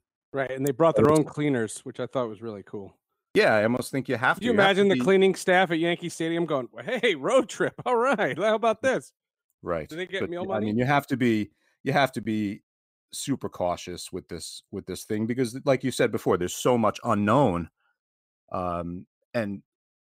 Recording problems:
none

